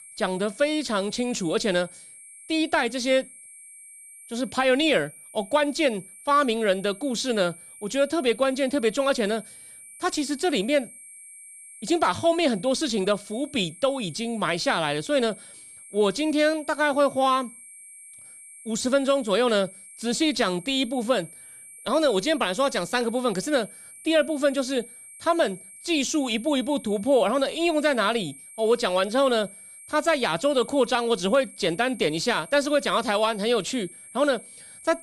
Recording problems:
high-pitched whine; noticeable; throughout; 8.5 kHz, 20 dB below the speech

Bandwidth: 15 kHz